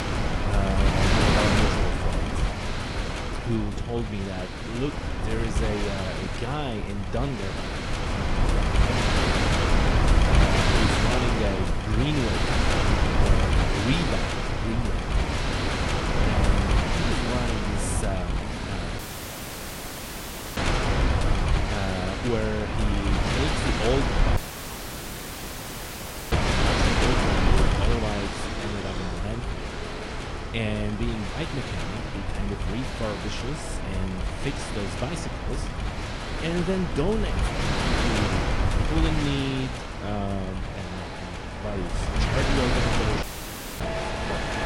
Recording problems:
garbled, watery; slightly
wind noise on the microphone; heavy; 5 dB above the speech
traffic noise; noticeable; throughout; 10 dB below the speech
audio cutting out; at 19 s for 1.5 s, at 24 s for 2 s and at 43 s for 0.5 s

